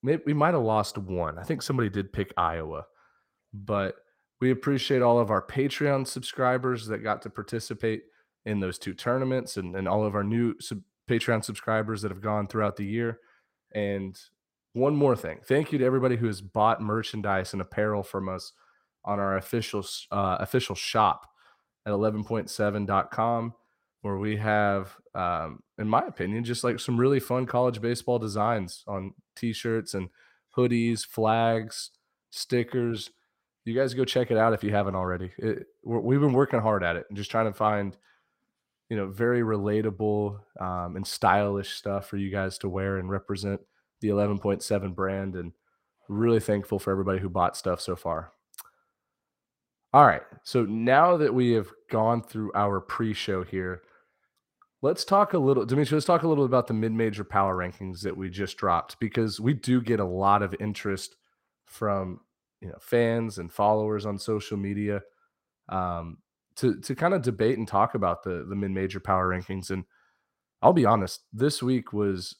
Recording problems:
uneven, jittery; strongly; from 4.5 s to 1:11

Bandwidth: 16 kHz